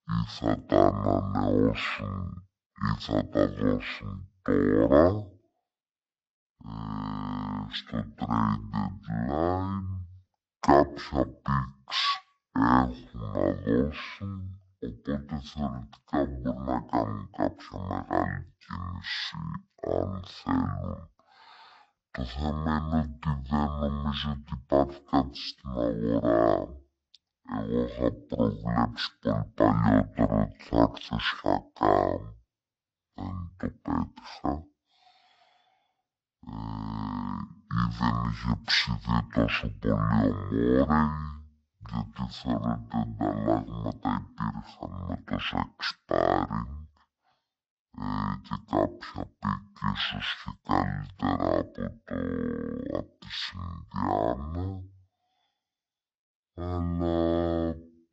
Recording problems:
wrong speed and pitch; too slow and too low; 0.5 times normal speed

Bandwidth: 8 kHz